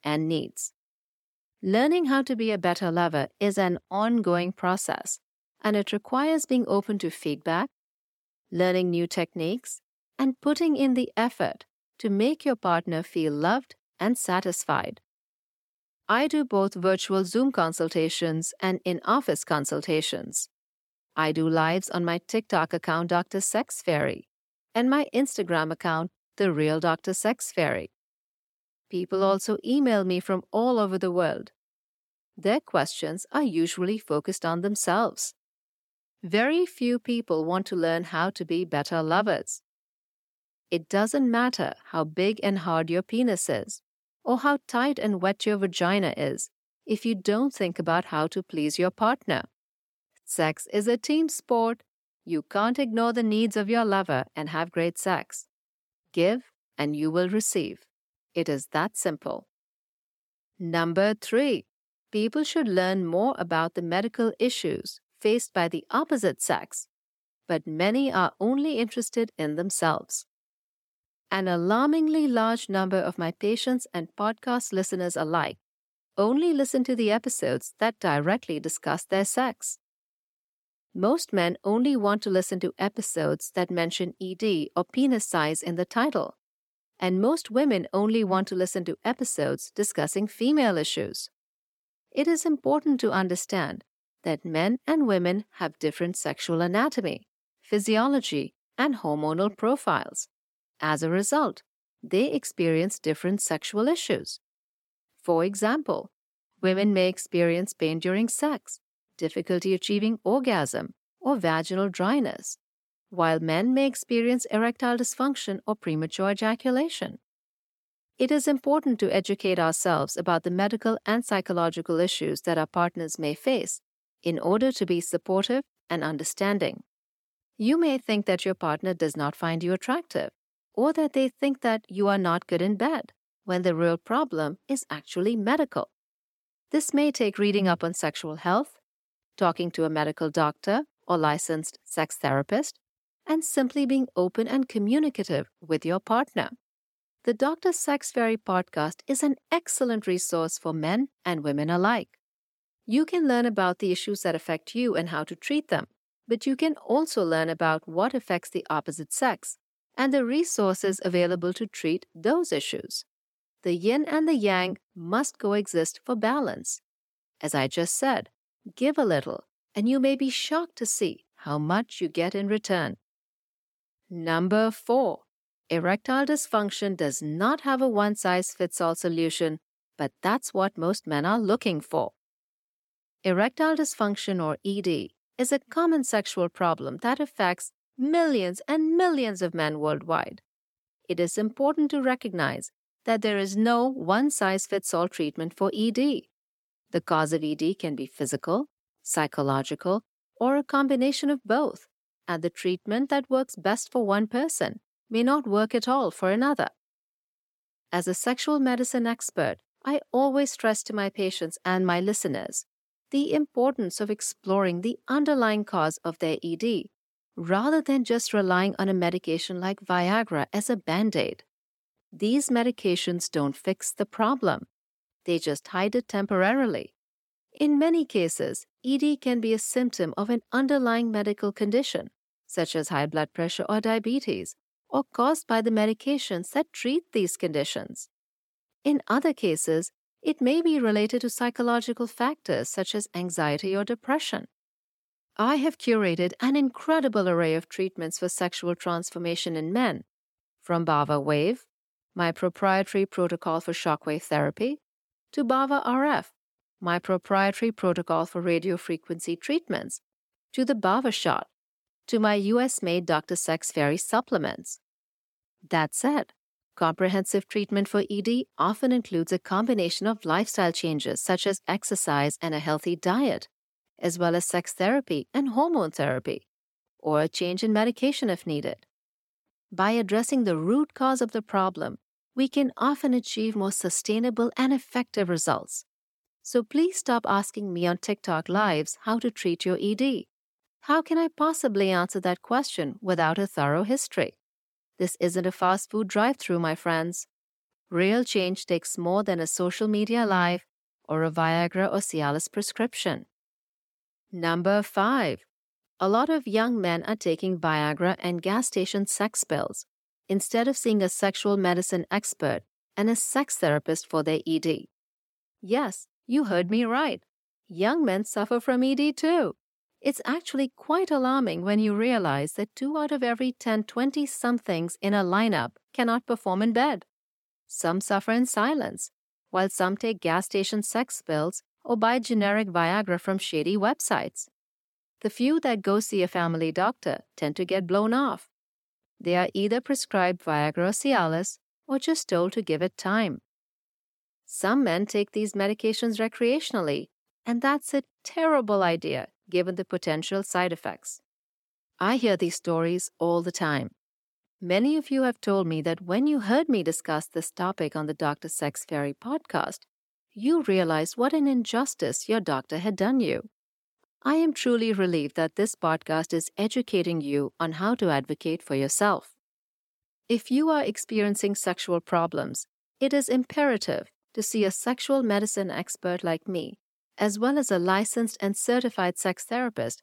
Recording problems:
none

